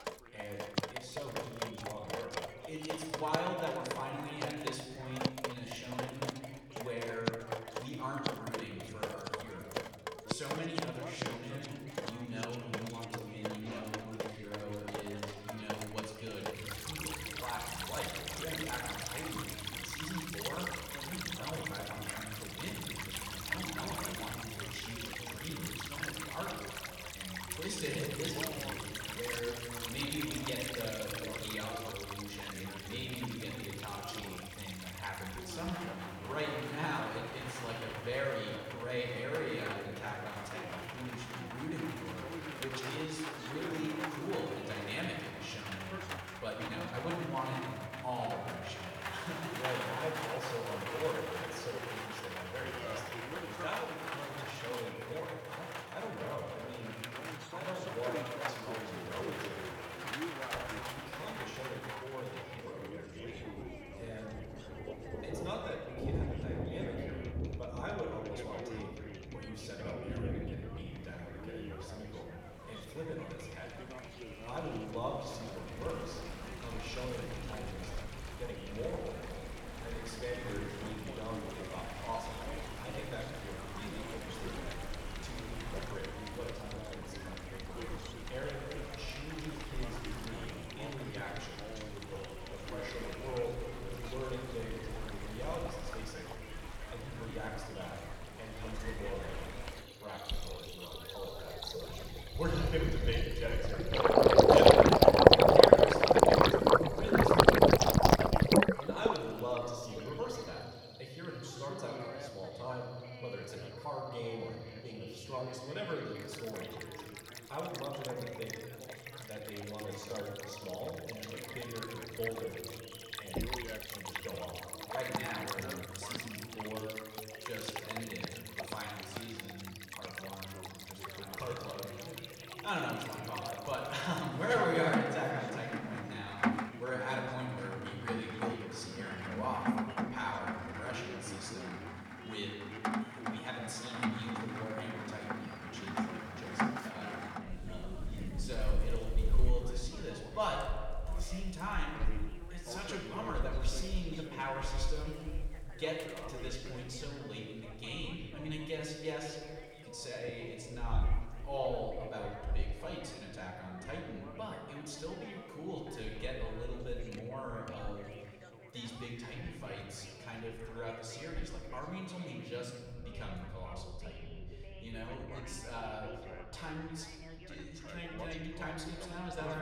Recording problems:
off-mic speech; far
room echo; noticeable; dies away in 1.9 s
rain or running water; very loud; throughout; 7 dB above the speech
background chatter; loud; throughout; 2 voices, 10 dB below the speech
household noises; very faint; until 2:12; 9 dB below the speech
door banging; noticeable; at 2:03; peak level with the speech
abrupt cut into speech; at the end

